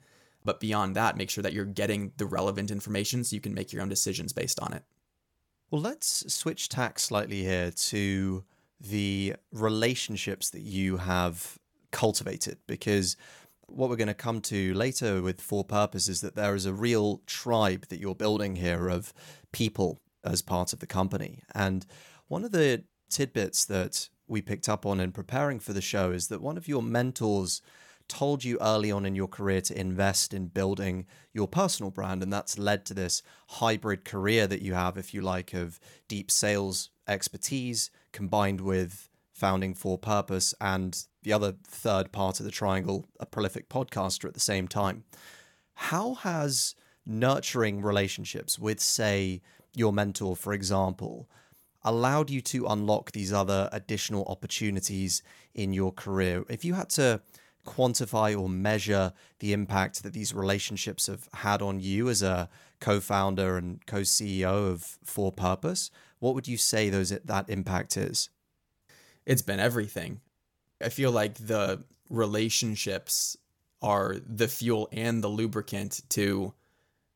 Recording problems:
none

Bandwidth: 17.5 kHz